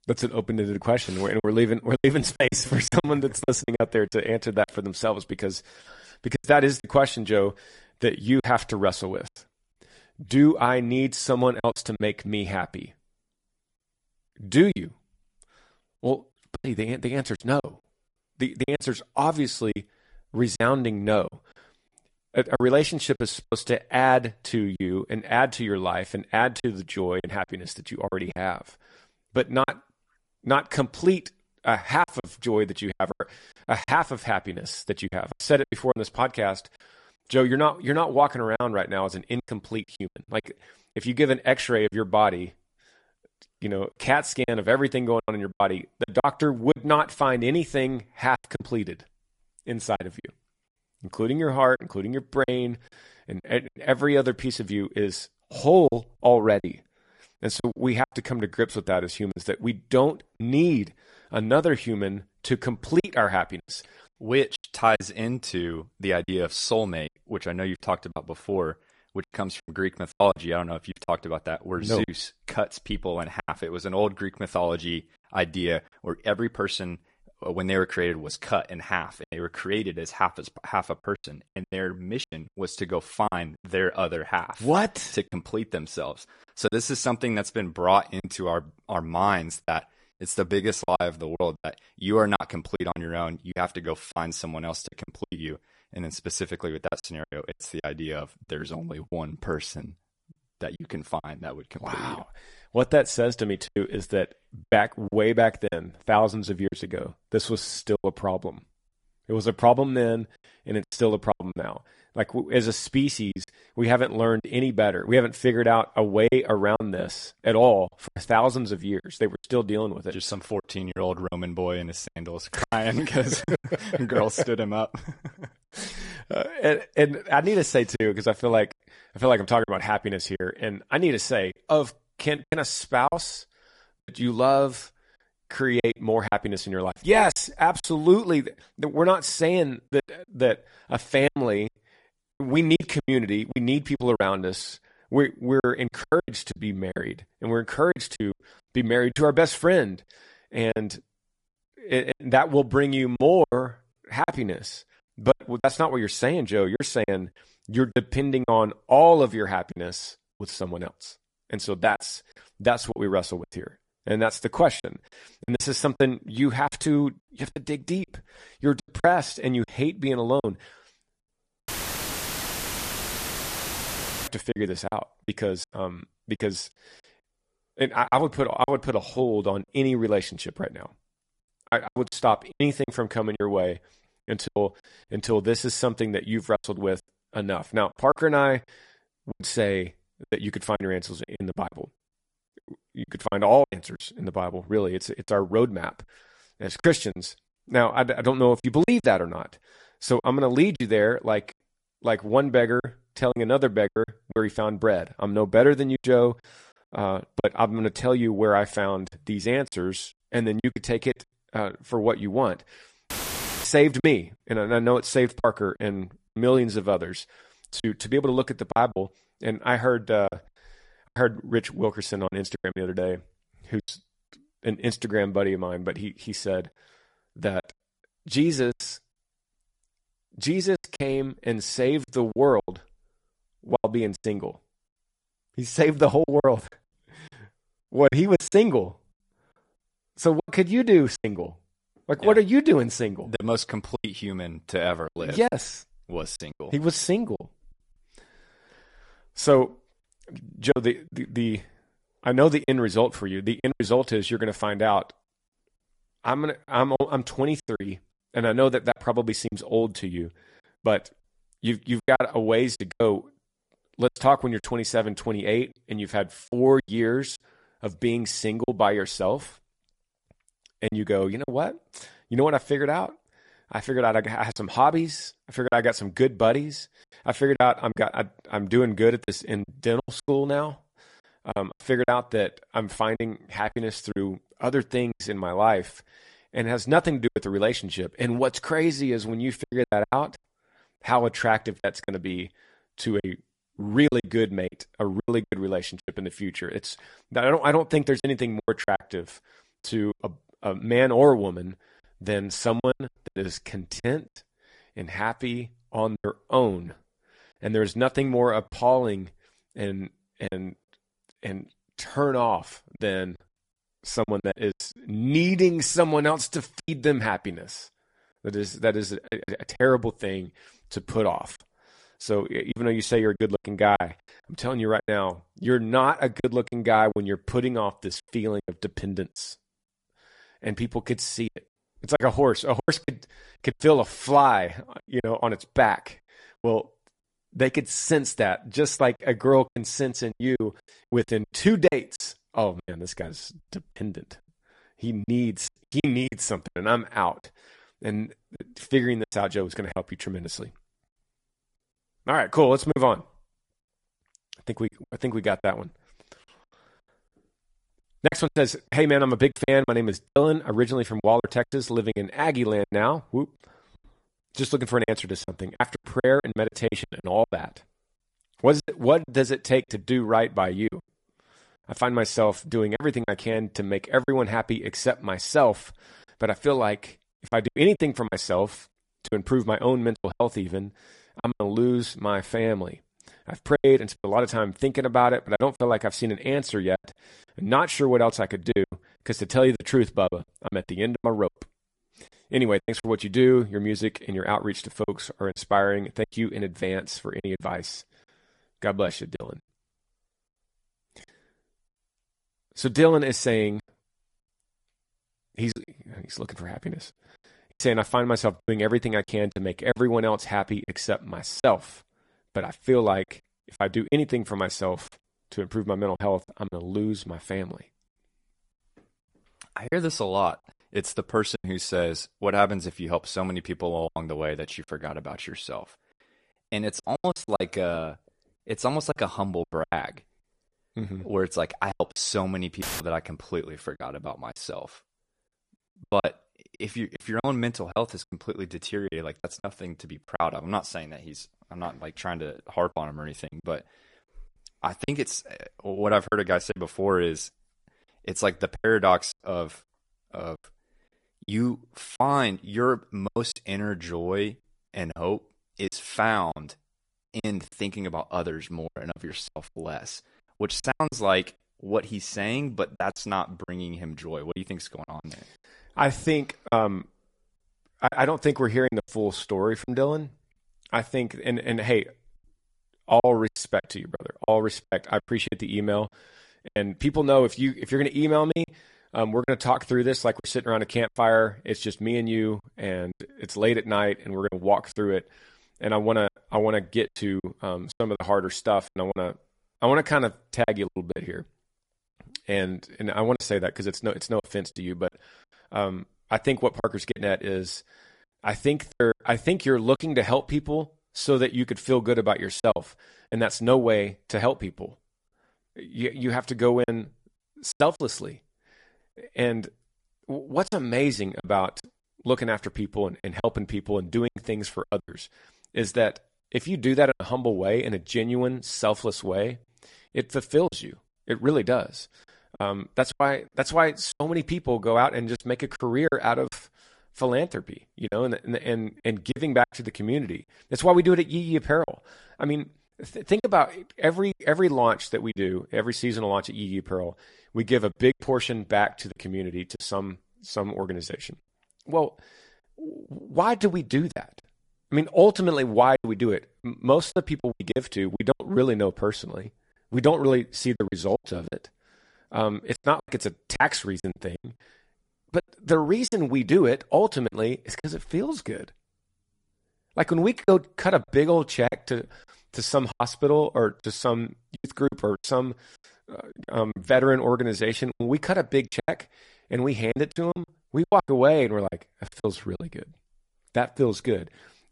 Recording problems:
garbled, watery; slightly; nothing above 10.5 kHz
choppy; very; 8% of the speech affected
audio cutting out; filled with static; at 2:52 for 2.5 s, at 3:33 for 0.5 s and at 7:13

